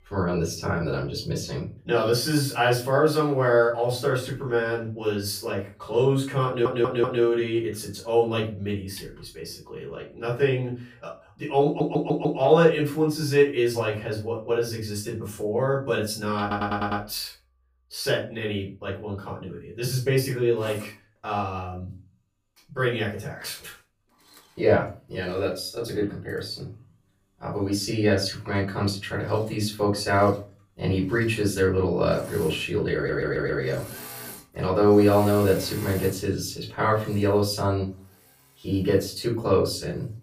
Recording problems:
off-mic speech; far
room echo; slight; dies away in 0.3 s
machinery noise; noticeable; throughout; 20 dB below the speech
audio stuttering; 4 times, first at 6.5 s

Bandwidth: 15 kHz